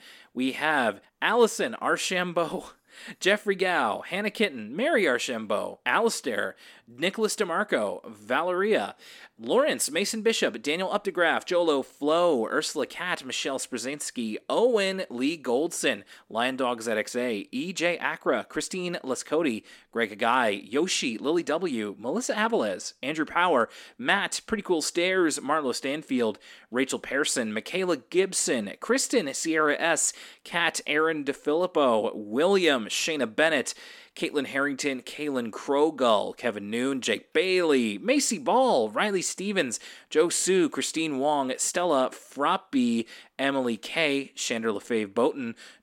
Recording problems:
none

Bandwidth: 17.5 kHz